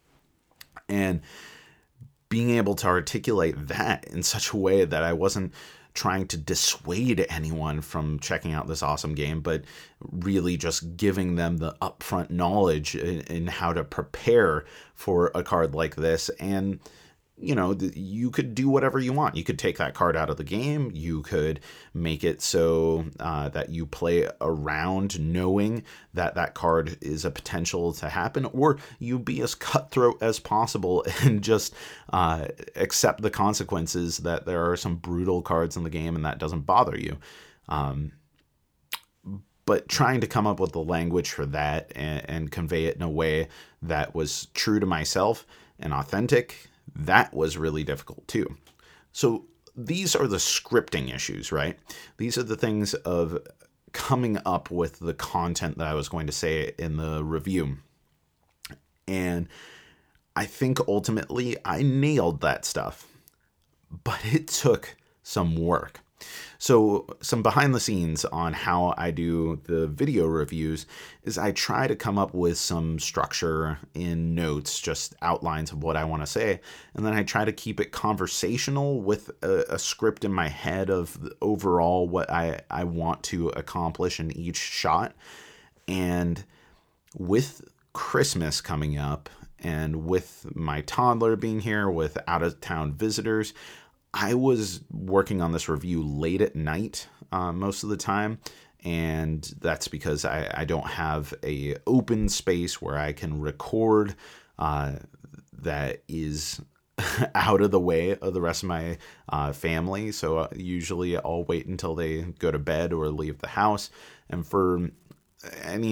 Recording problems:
abrupt cut into speech; at the end

